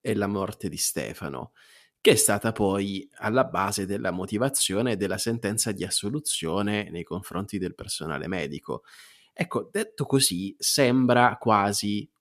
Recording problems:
none

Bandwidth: 14.5 kHz